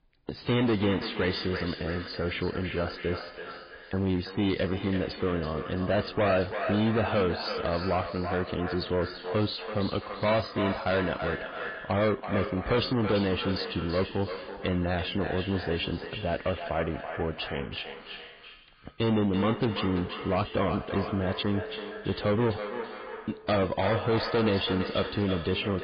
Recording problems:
distortion; heavy; 9% of the sound clipped
echo of what is said; strong; throughout; 330 ms later, 8 dB below the speech
garbled, watery; badly; nothing above 4.5 kHz
alarms or sirens; noticeable; from 19 s on; 20 dB below the speech

